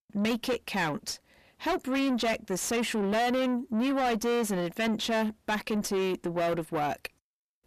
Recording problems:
distortion; heavy; 6 dB below the speech

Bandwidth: 14.5 kHz